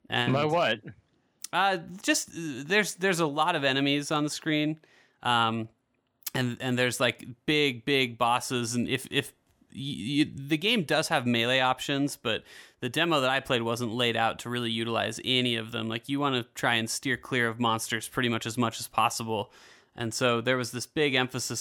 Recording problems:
abrupt cut into speech; at the end

